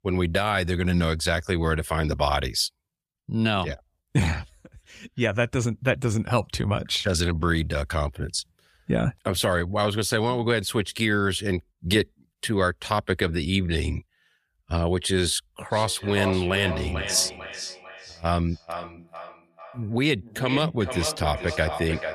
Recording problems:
echo of what is said; strong; from 16 s on; 450 ms later, 9 dB below the speech

